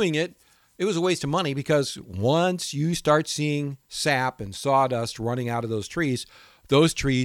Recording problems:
abrupt cut into speech; at the start and the end

